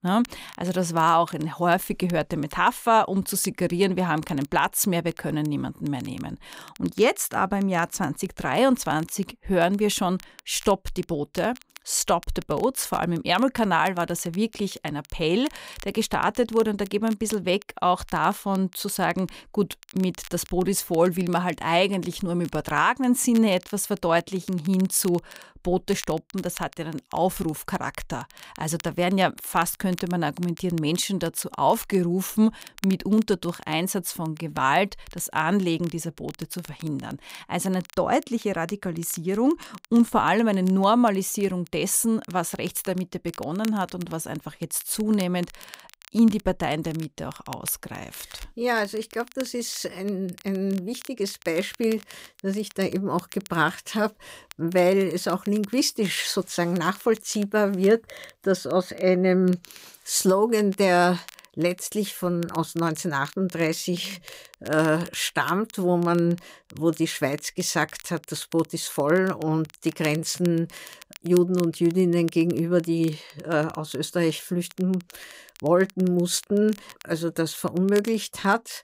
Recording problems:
crackle, like an old record; faint; 20 dB below the speech

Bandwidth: 15.5 kHz